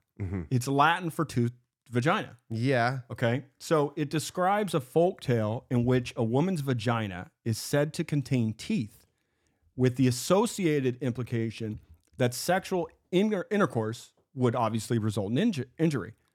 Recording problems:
none

